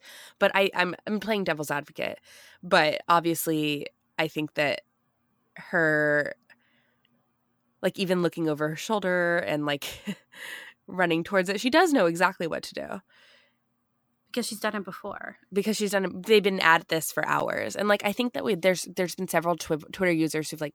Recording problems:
none

